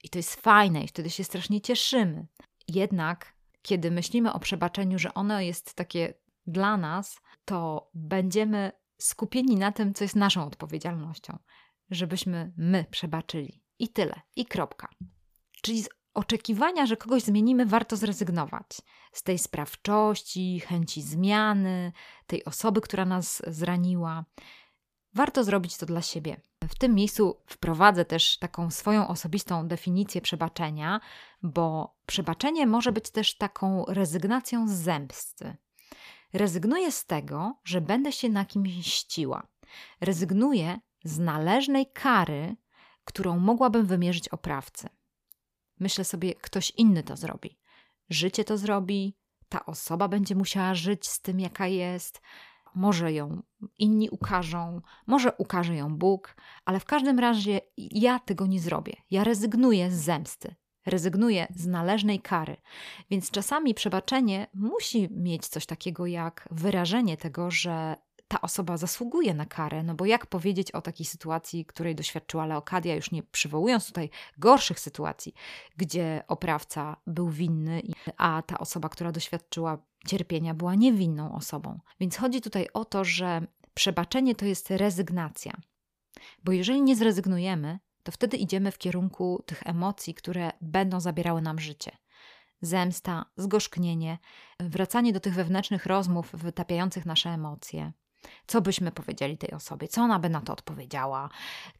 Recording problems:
none

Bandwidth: 15 kHz